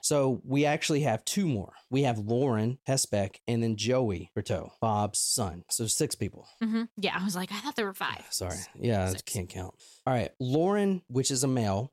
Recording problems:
none

